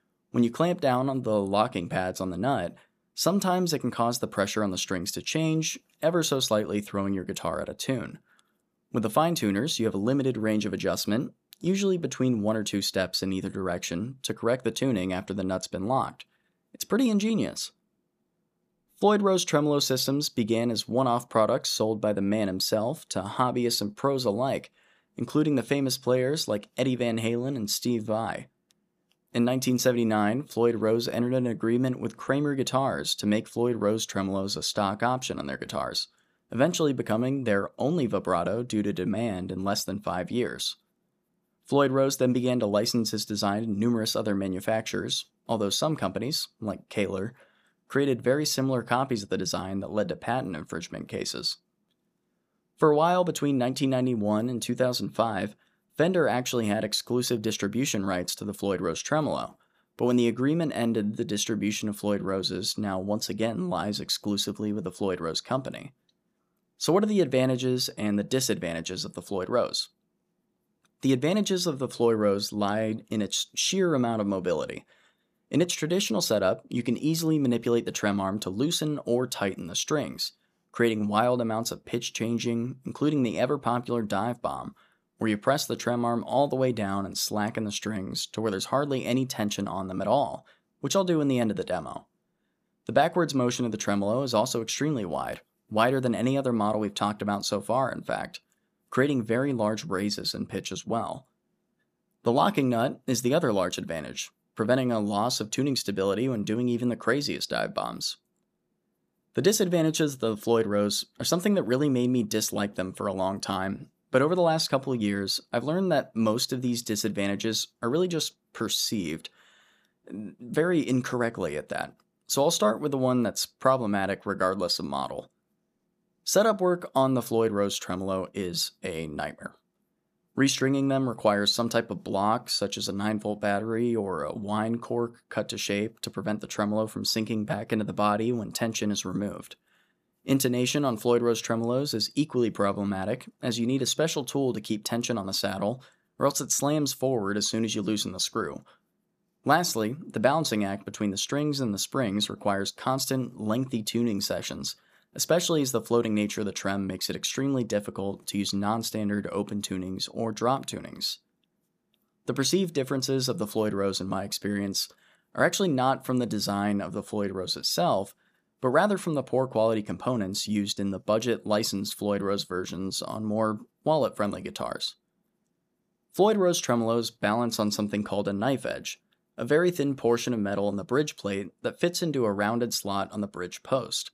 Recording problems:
none

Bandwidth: 14.5 kHz